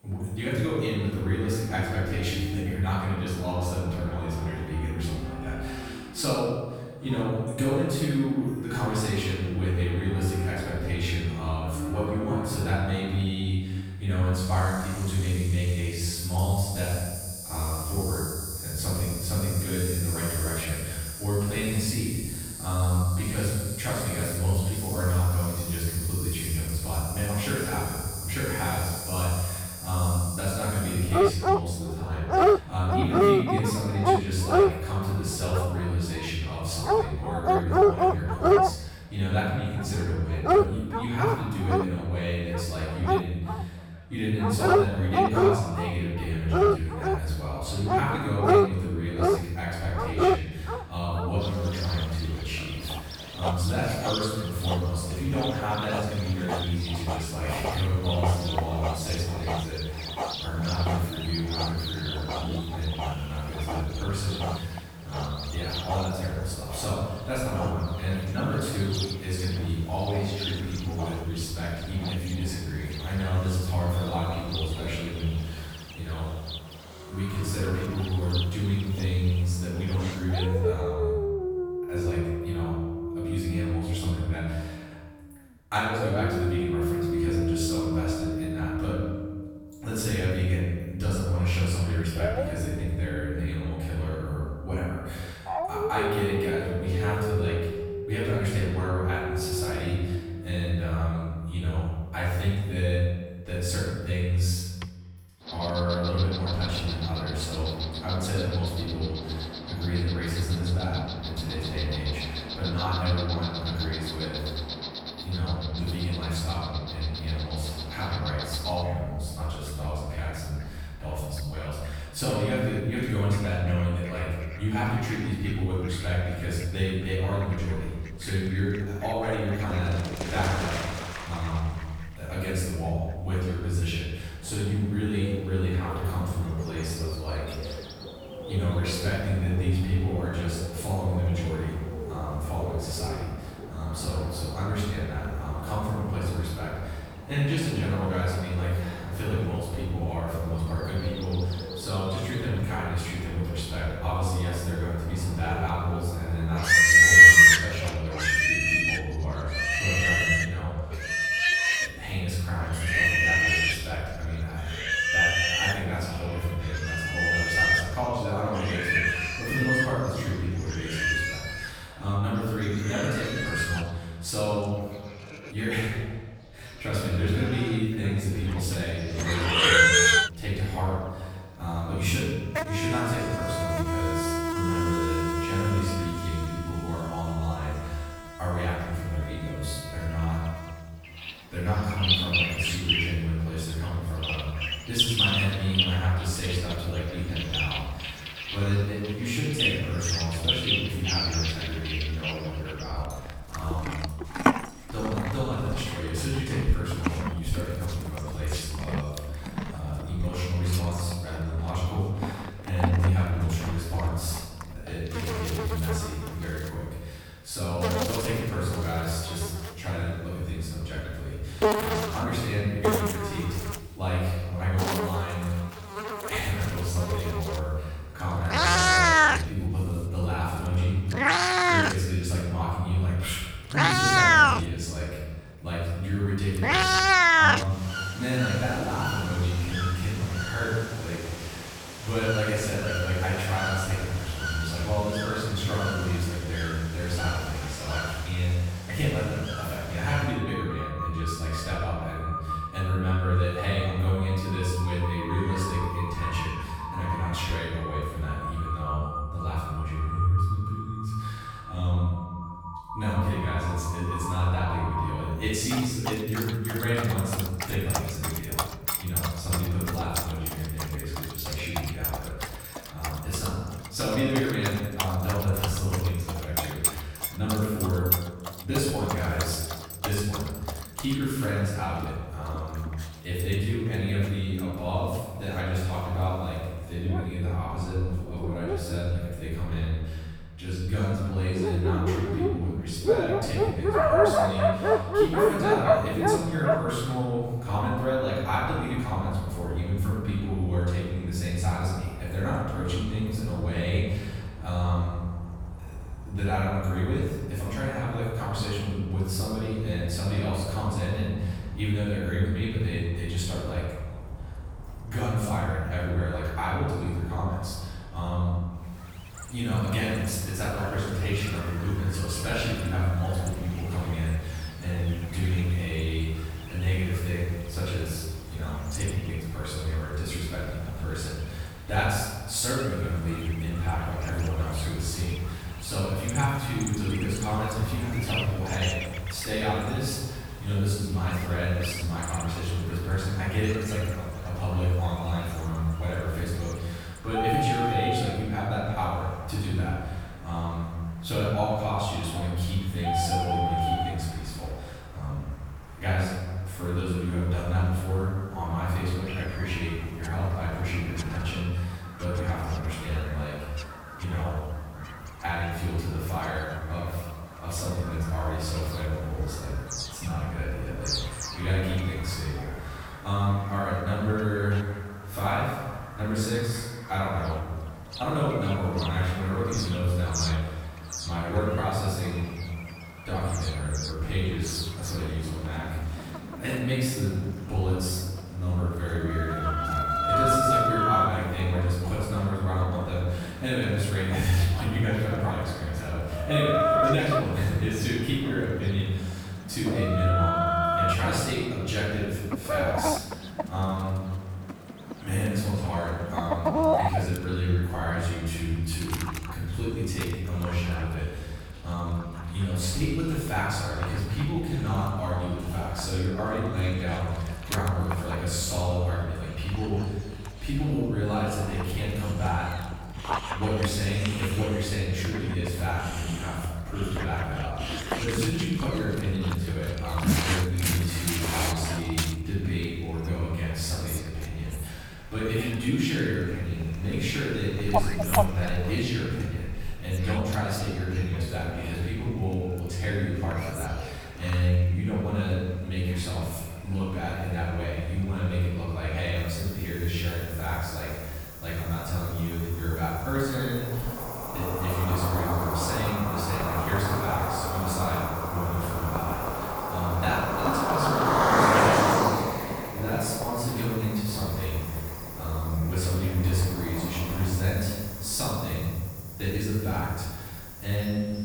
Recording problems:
room echo; strong; dies away in 1.3 s
off-mic speech; far
animal sounds; very loud; throughout; 1 dB above the speech

